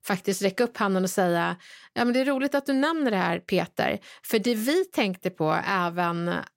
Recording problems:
none

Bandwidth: 16 kHz